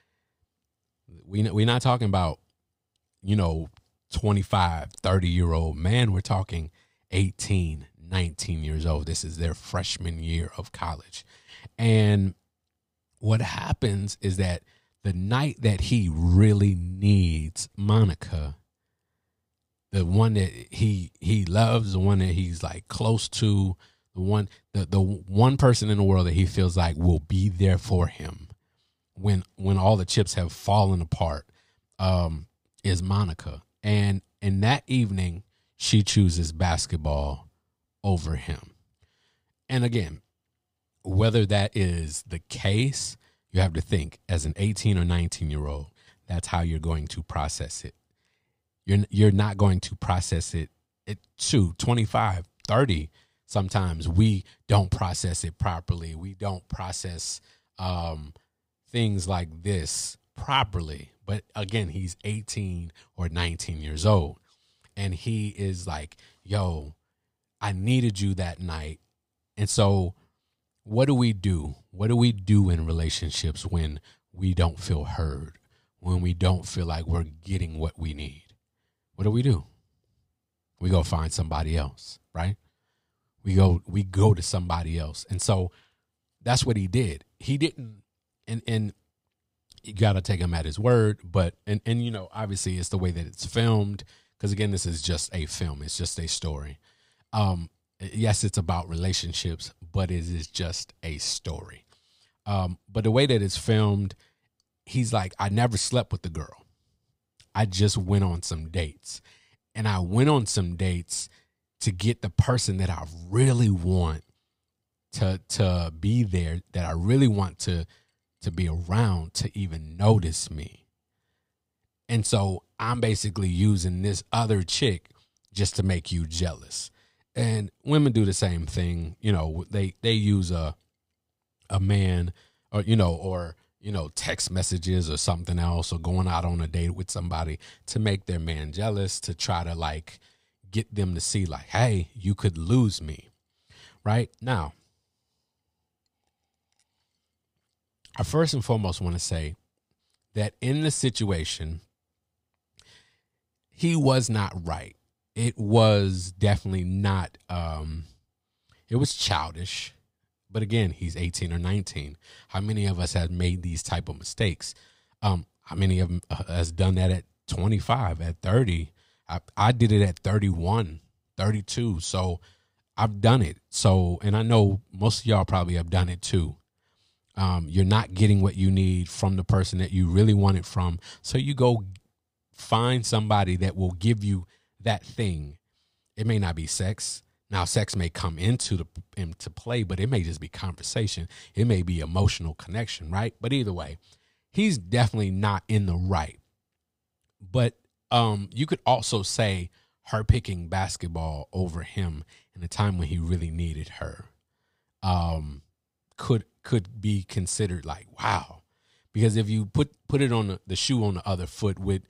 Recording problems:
none

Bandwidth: 15.5 kHz